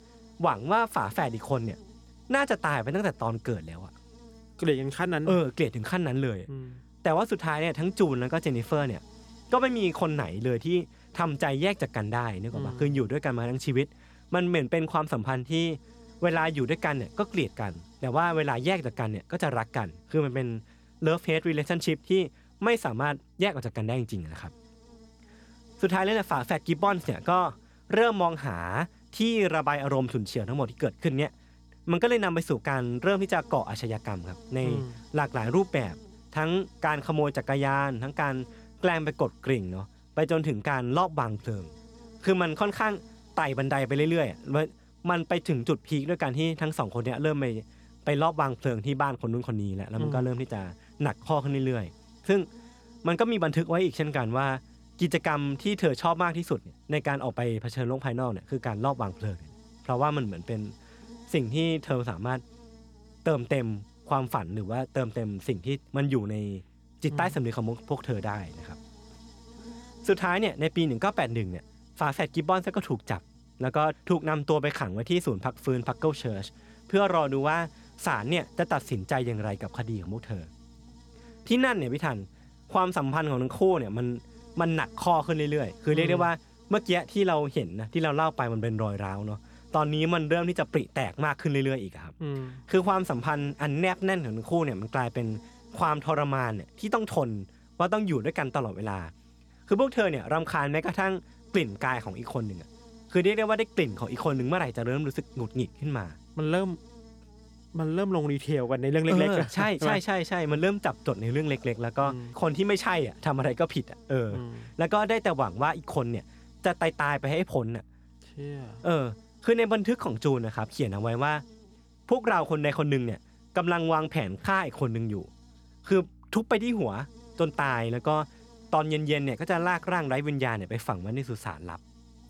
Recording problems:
electrical hum; faint; throughout; 60 Hz, 30 dB below the speech

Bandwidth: 18.5 kHz